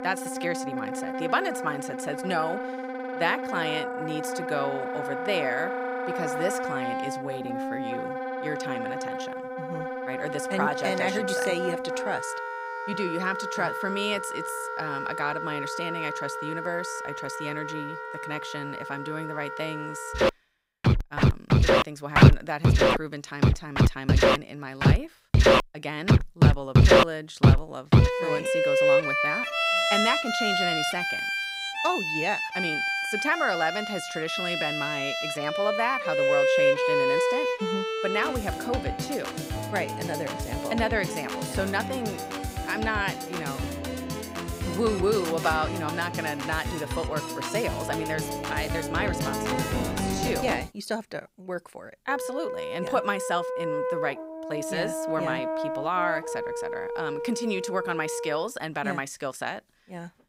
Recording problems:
background music; very loud; throughout; 4 dB above the speech

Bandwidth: 15.5 kHz